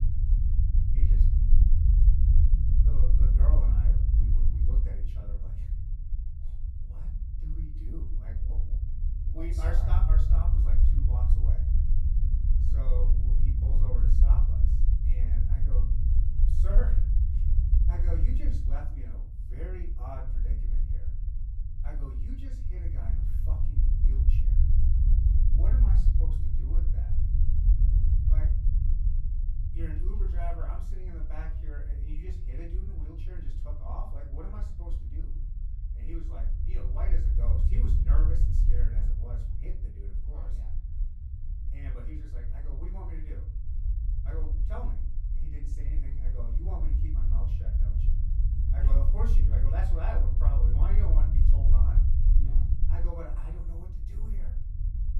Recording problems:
off-mic speech; far
room echo; slight; dies away in 0.4 s
low rumble; loud; throughout; 1 dB below the speech

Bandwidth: 14.5 kHz